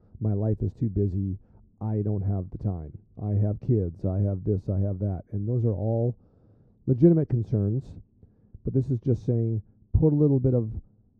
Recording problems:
muffled; very; fading above 1 kHz

